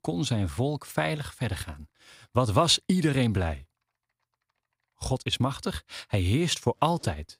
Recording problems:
household noises; faint; throughout; 30 dB below the speech

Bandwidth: 15.5 kHz